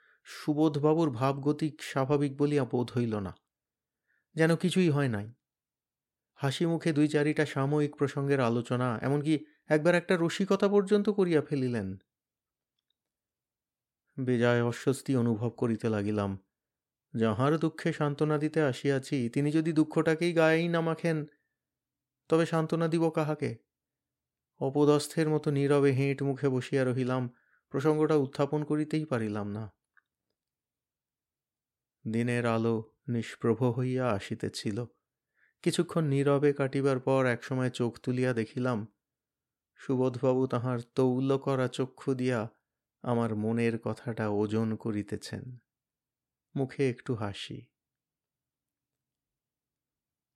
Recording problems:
none

